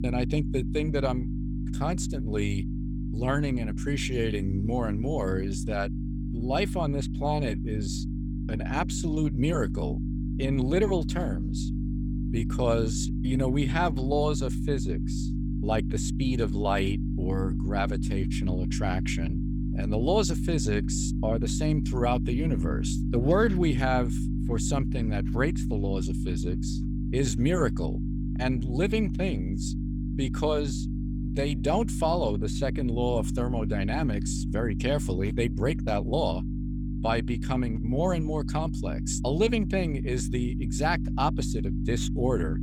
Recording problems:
electrical hum; loud; throughout; 50 Hz, 9 dB below the speech

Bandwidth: 18 kHz